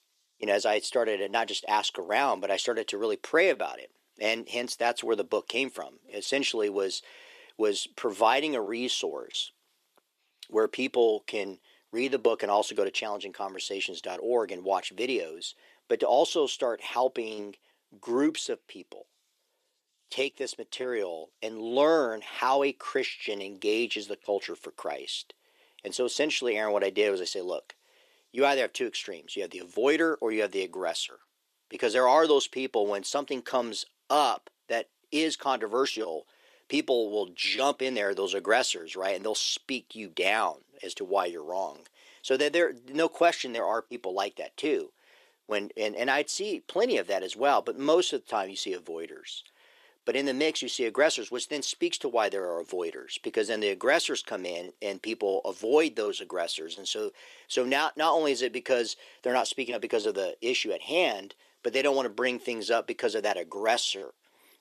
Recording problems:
thin; somewhat; fading below 350 Hz

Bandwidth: 14 kHz